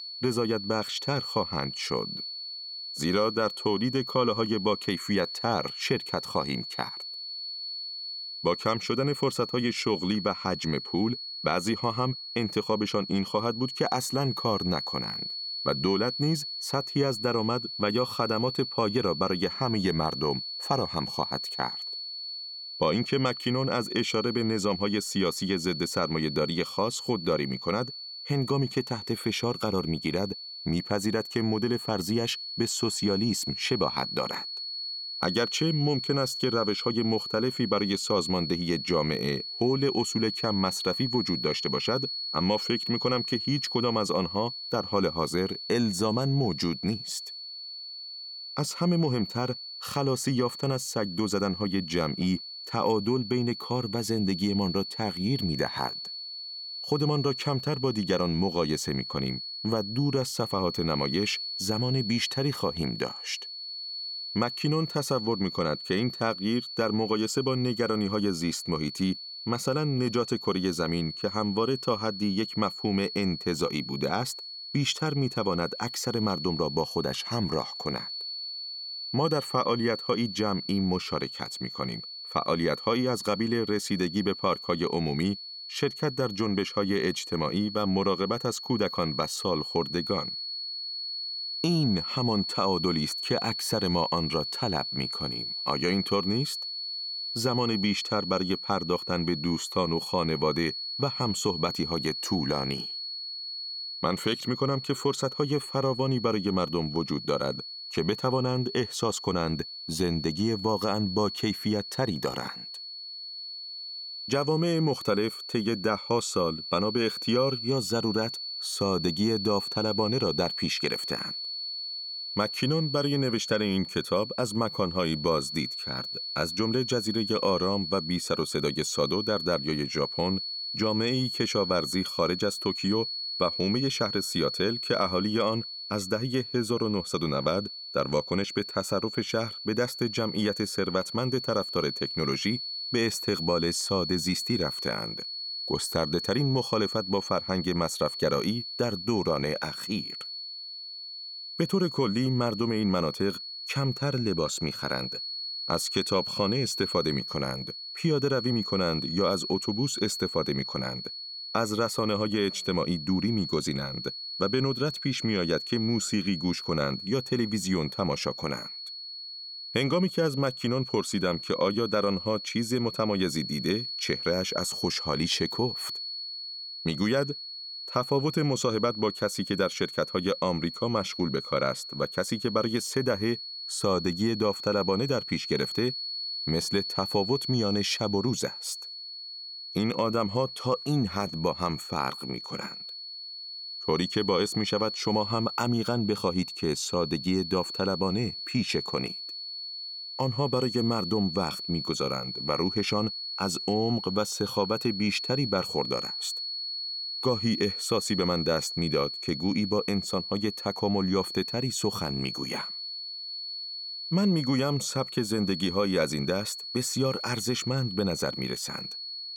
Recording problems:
high-pitched whine; loud; throughout; 4.5 kHz, 5 dB below the speech

